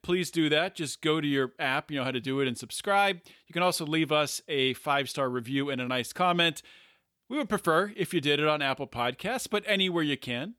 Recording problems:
none

